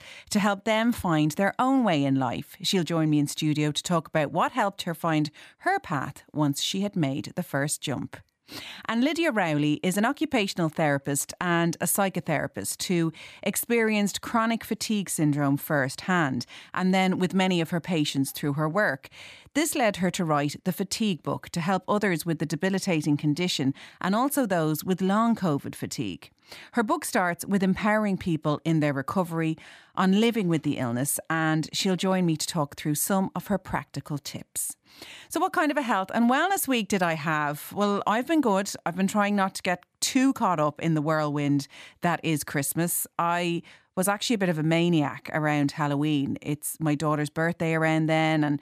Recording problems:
none

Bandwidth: 14.5 kHz